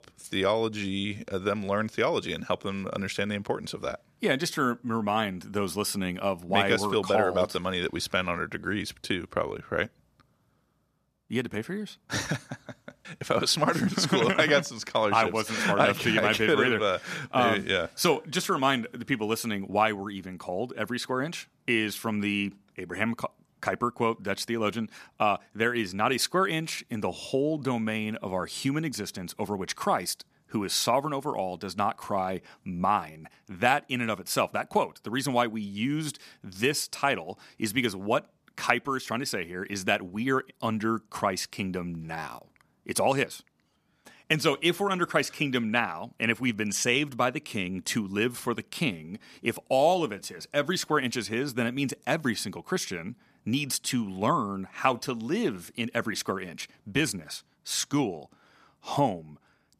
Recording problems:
none

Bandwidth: 14.5 kHz